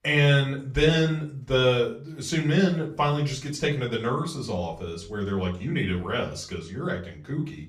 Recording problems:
off-mic speech; far
room echo; slight; dies away in 0.4 s

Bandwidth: 14.5 kHz